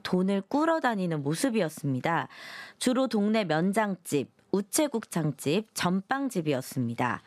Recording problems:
squashed, flat; somewhat

